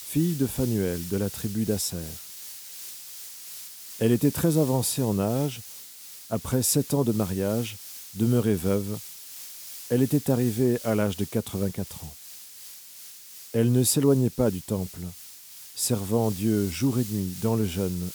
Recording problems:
hiss; noticeable; throughout; 15 dB below the speech

